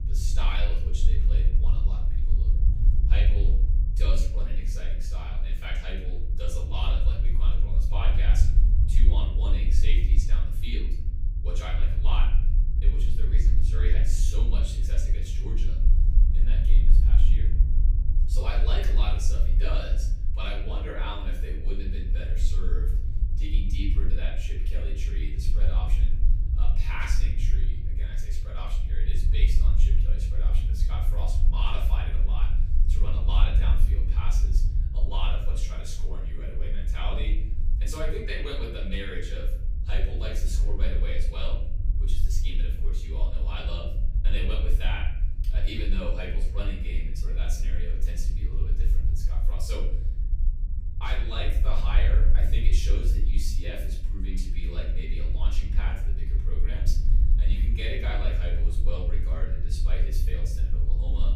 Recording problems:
off-mic speech; far
room echo; noticeable; dies away in 0.8 s
low rumble; loud; throughout; 9 dB below the speech

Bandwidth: 15.5 kHz